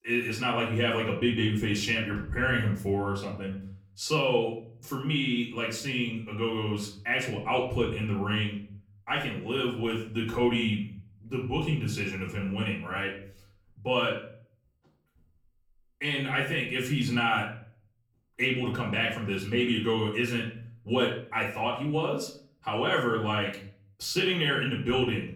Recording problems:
off-mic speech; far
room echo; slight; dies away in 0.6 s

